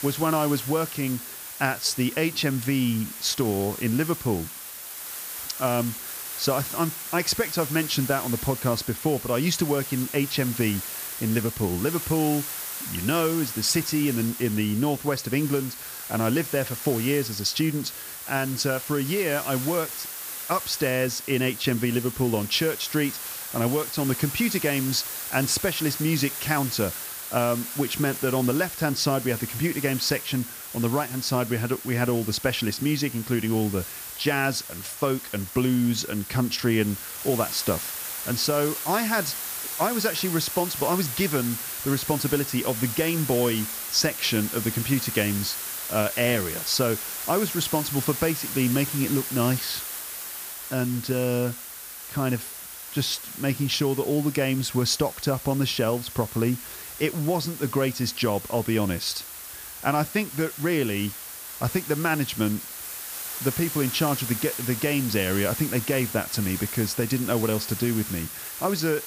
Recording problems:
hiss; loud; throughout; 6 dB below the speech

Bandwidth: 15 kHz